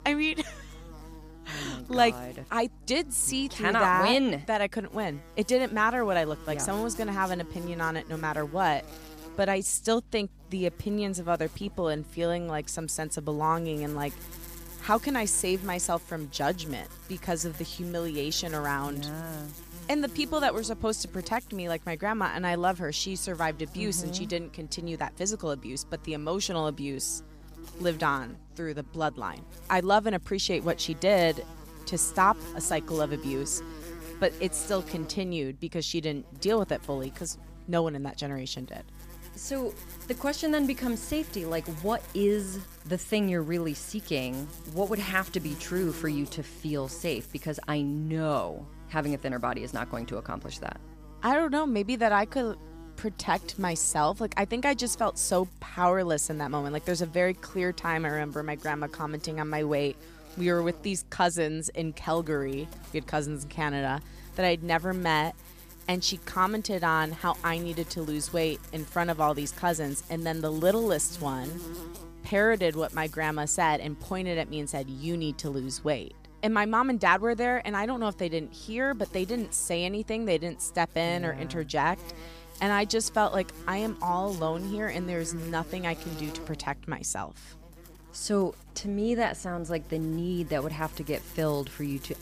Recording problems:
electrical hum; noticeable; throughout; 50 Hz, 20 dB below the speech

